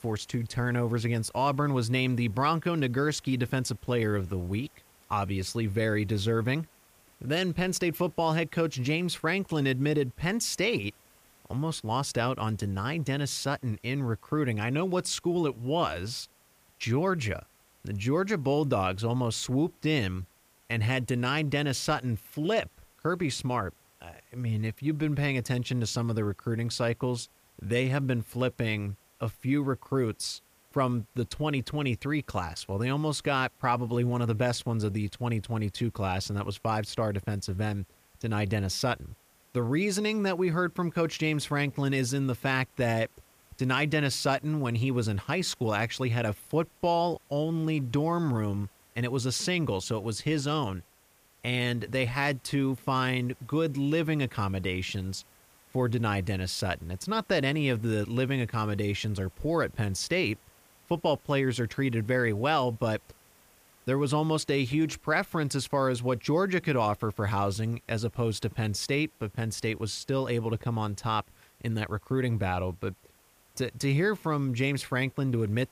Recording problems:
hiss; faint; throughout; 30 dB below the speech

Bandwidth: 15 kHz